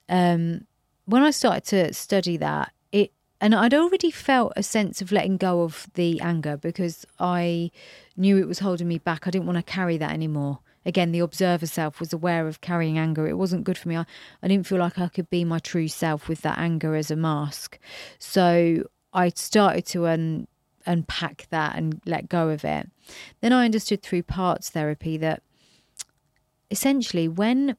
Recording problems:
none

